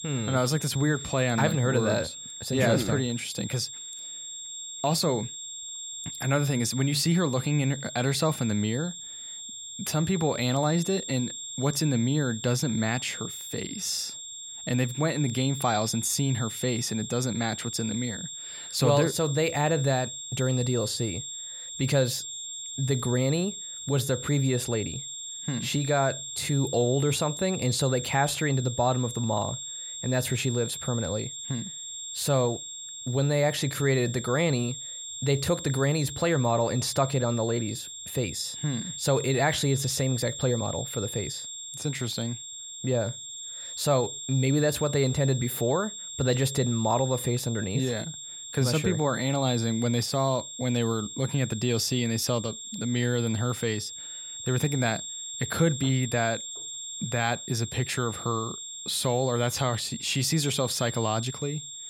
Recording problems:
high-pitched whine; loud; throughout; 7.5 kHz, 8 dB below the speech

